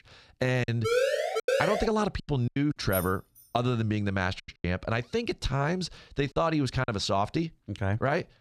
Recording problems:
choppy; very; from 0.5 to 3 s and from 4.5 to 7 s; 11% of the speech affected
siren; loud; from 1 to 2 s; peak 3 dB above the speech
jangling keys; noticeable; at 3 s; peak 7 dB below the speech

